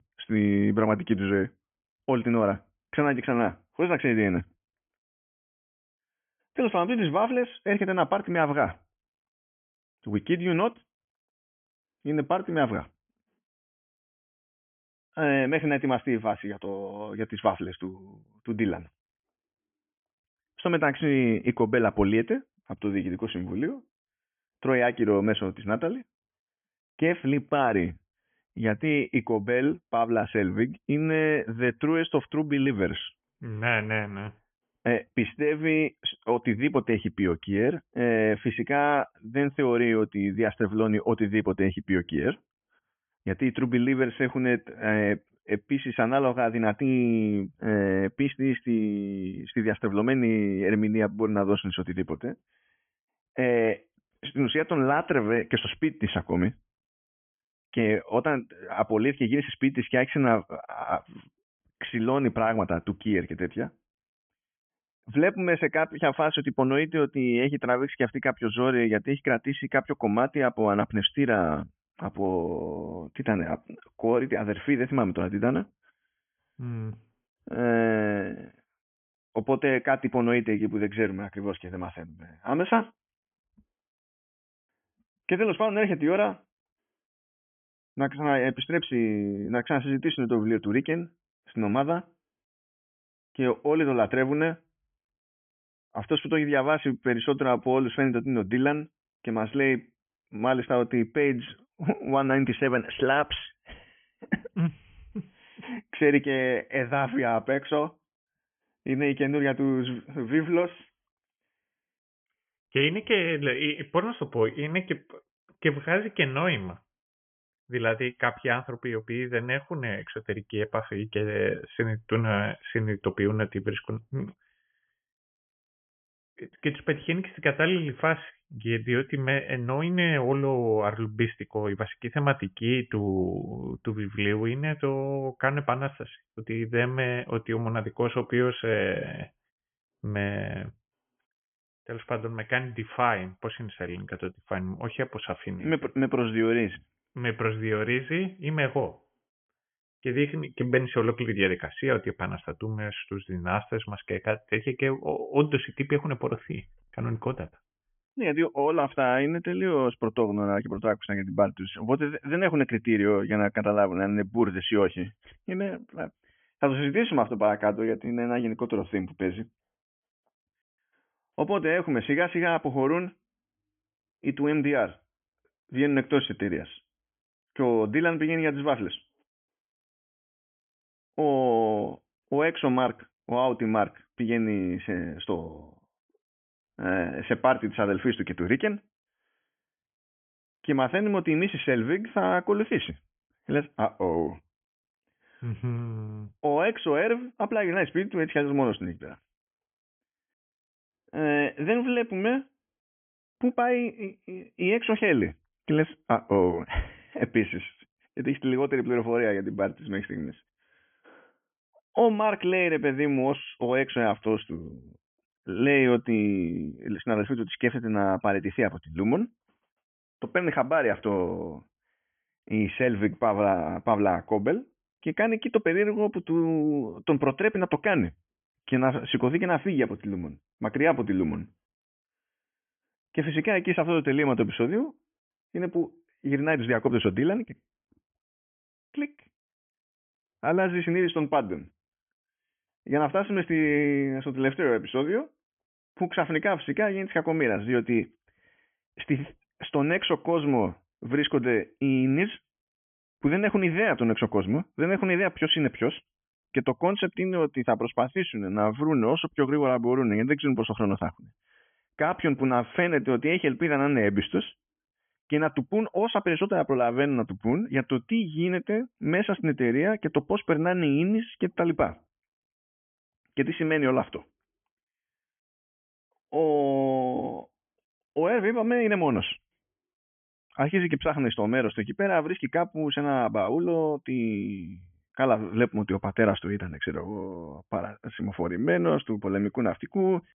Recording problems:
high frequencies cut off; severe; nothing above 3.5 kHz

